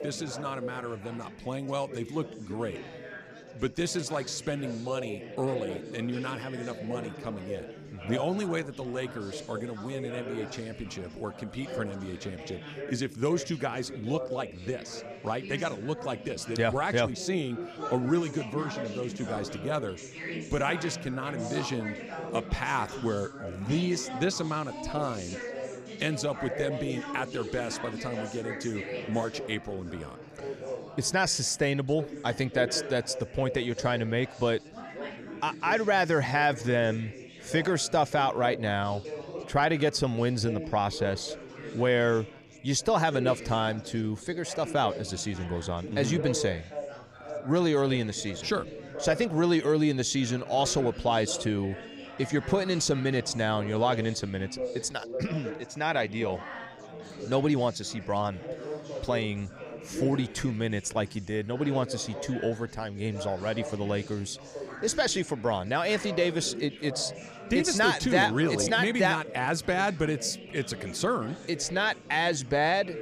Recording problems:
chatter from many people; noticeable; throughout; 10 dB below the speech

